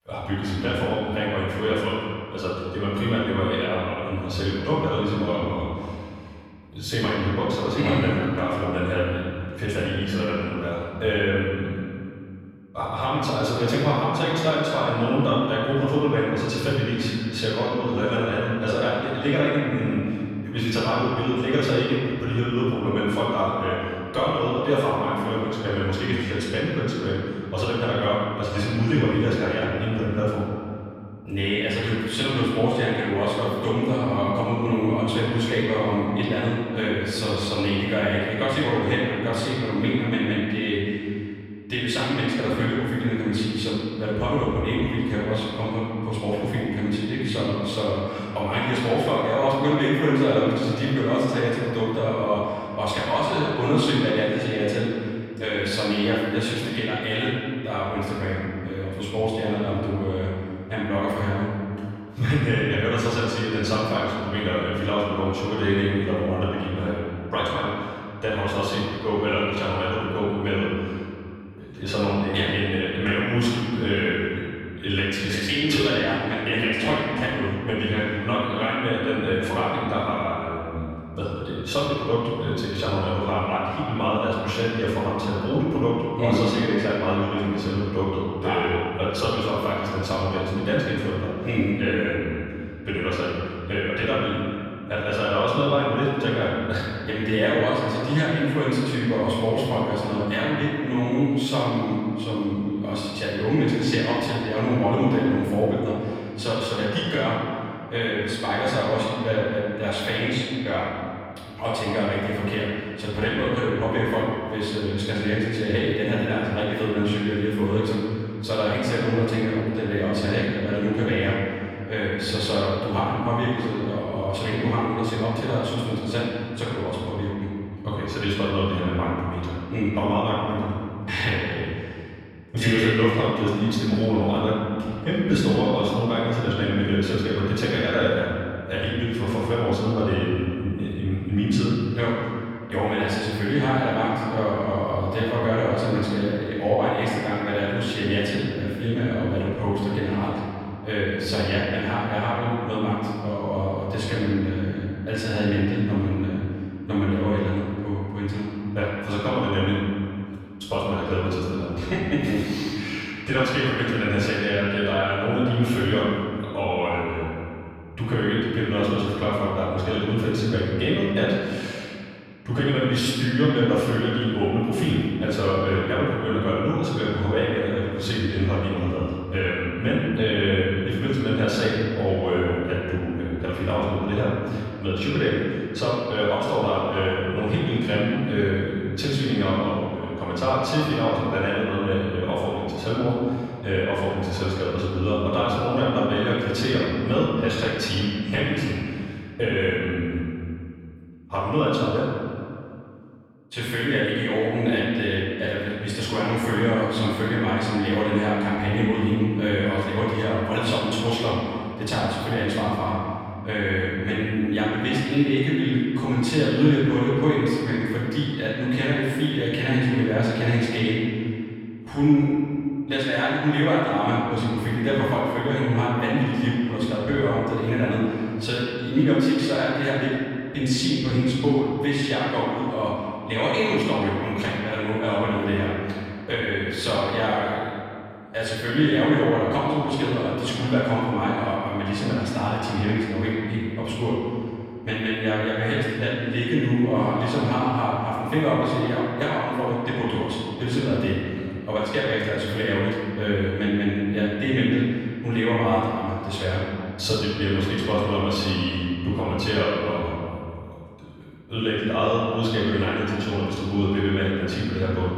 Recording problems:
room echo; strong; dies away in 2.1 s
off-mic speech; far

